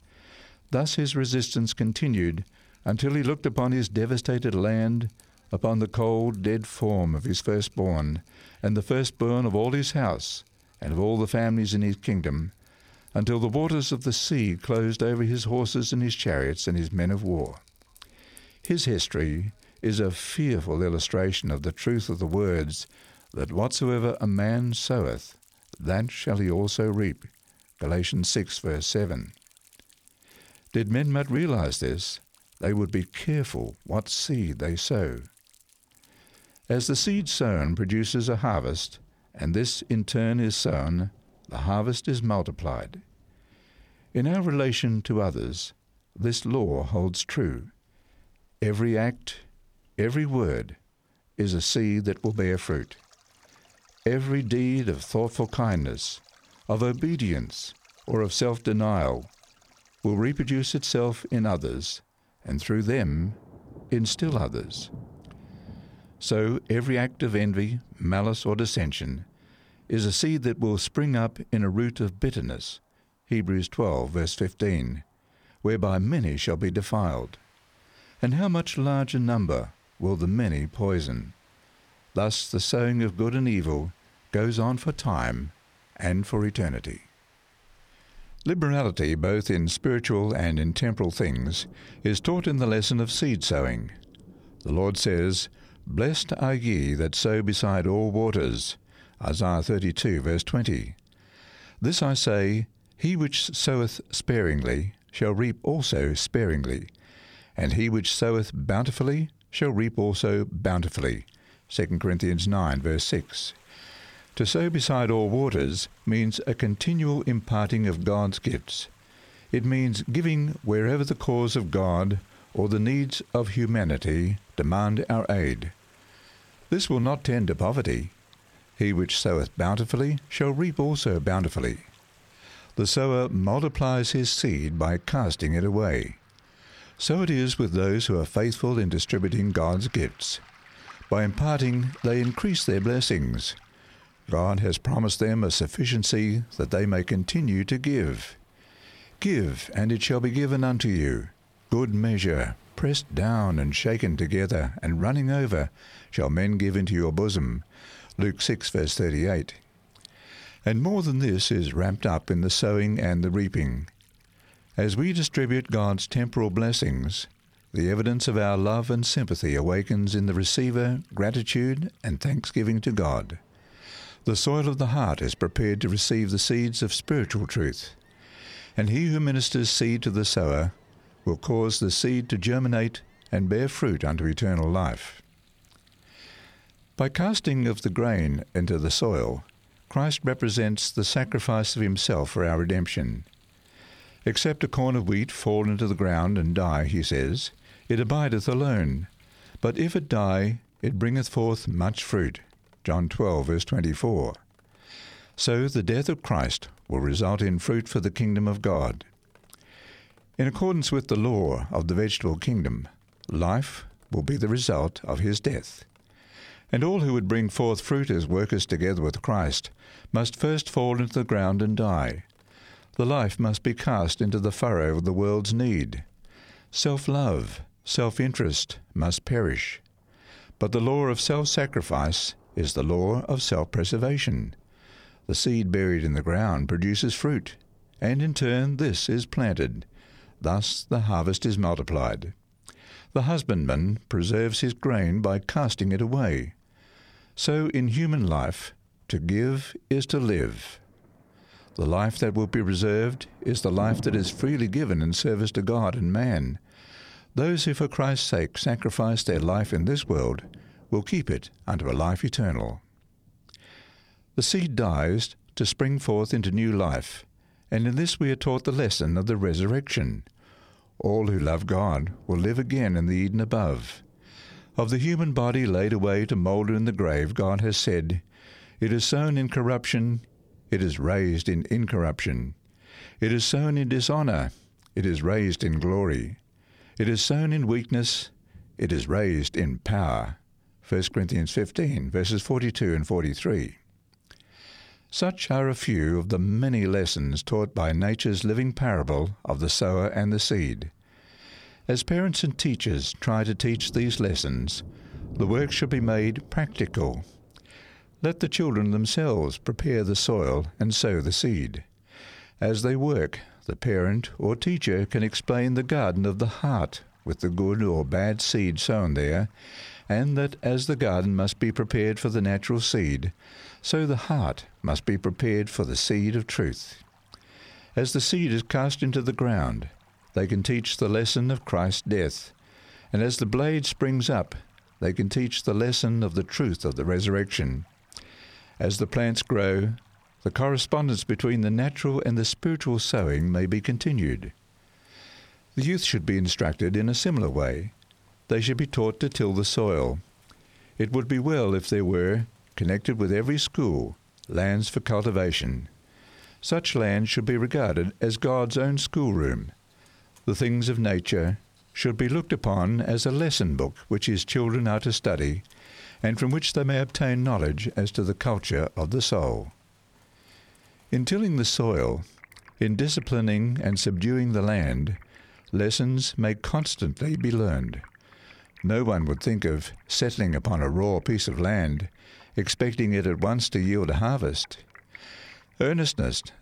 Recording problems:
rain or running water; faint; throughout; 30 dB below the speech

